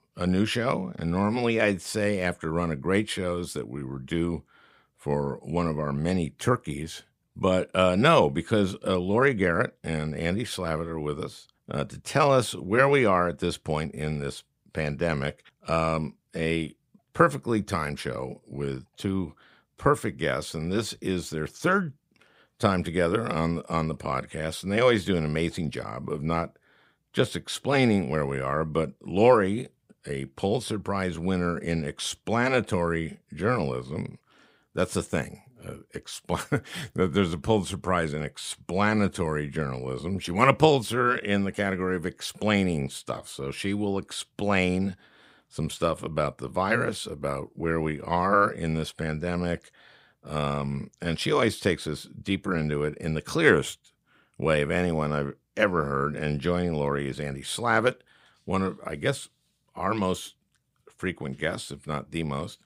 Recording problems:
none

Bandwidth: 15.5 kHz